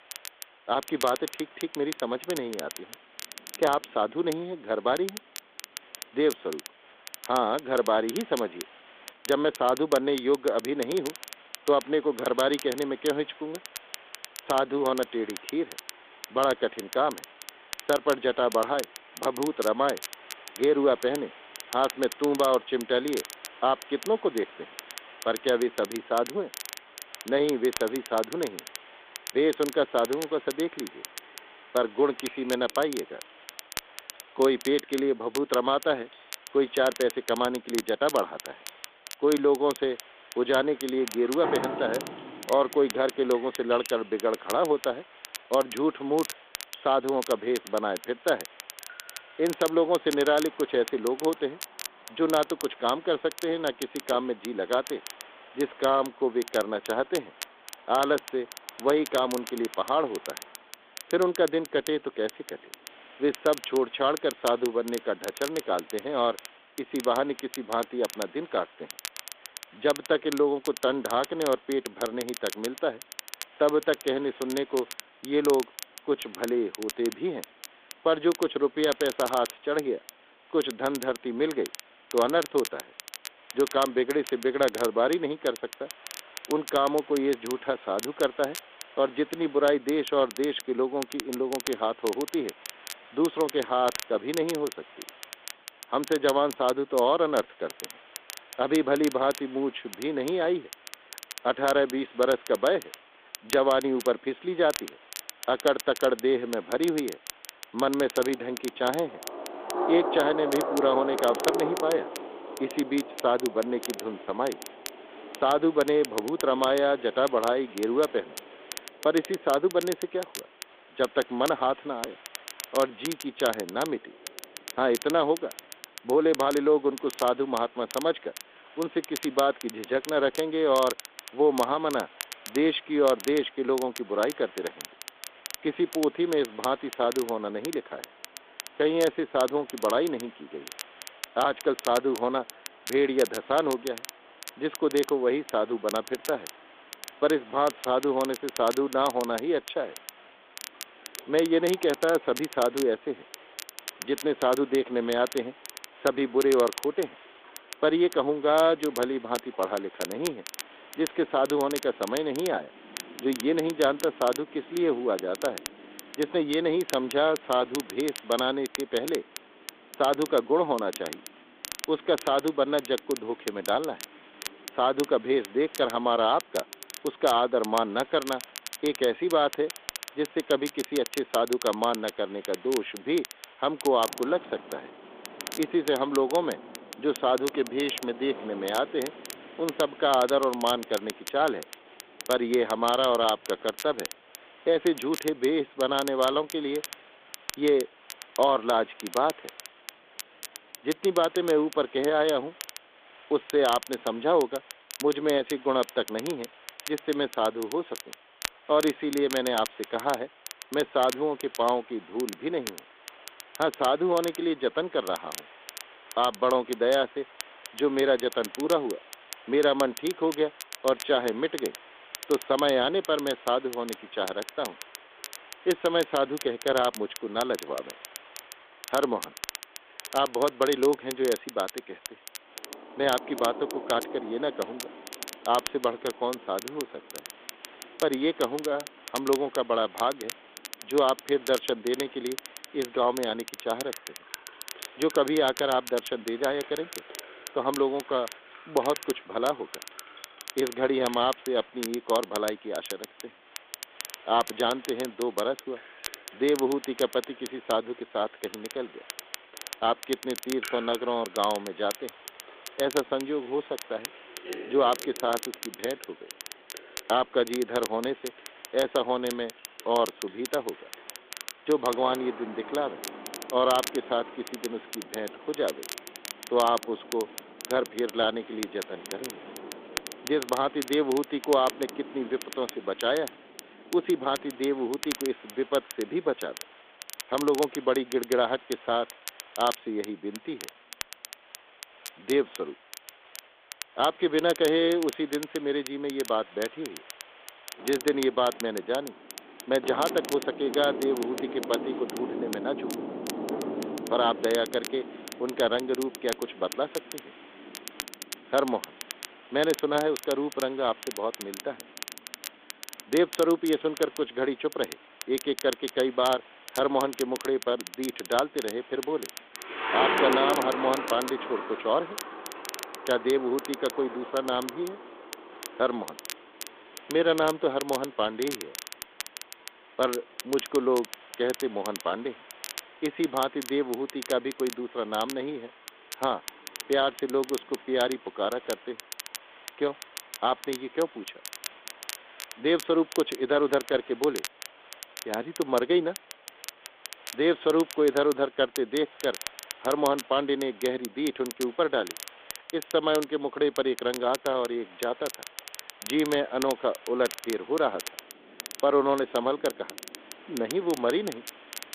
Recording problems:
phone-call audio; nothing above 3.5 kHz
rain or running water; noticeable; throughout; 15 dB below the speech
crackle, like an old record; noticeable; 15 dB below the speech
hiss; faint; throughout; 25 dB below the speech

